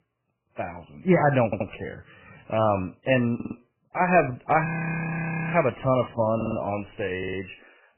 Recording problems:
garbled, watery; badly; nothing above 2.5 kHz
audio stuttering; 4 times, first at 1.5 s
audio freezing; at 4.5 s for 1 s

